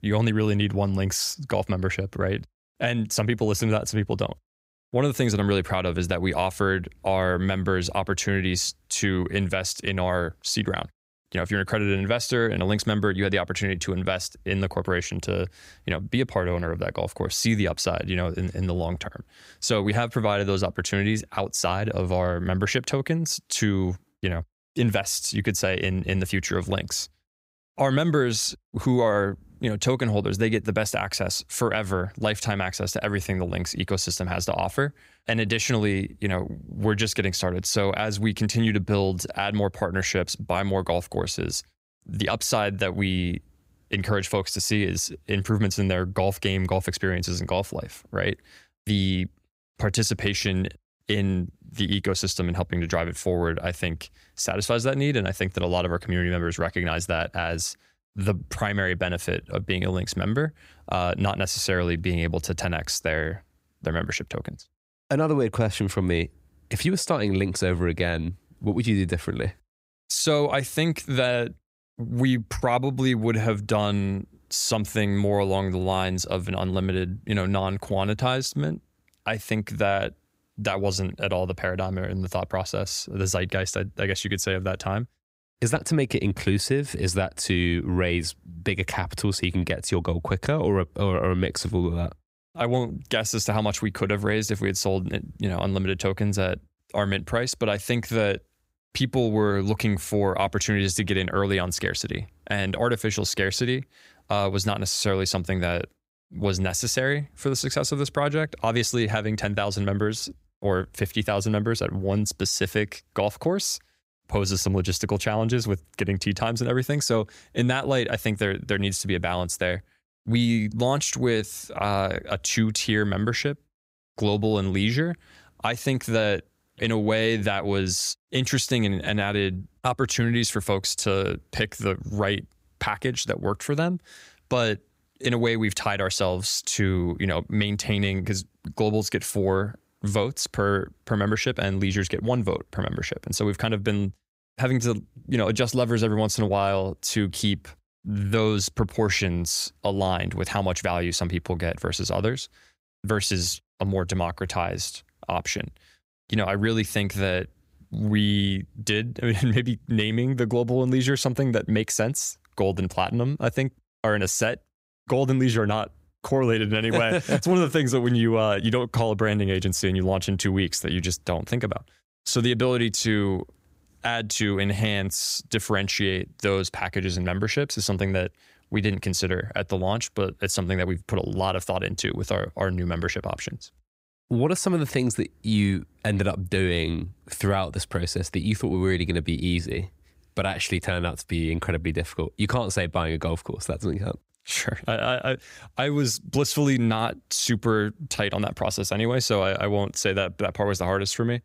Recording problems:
none

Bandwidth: 15.5 kHz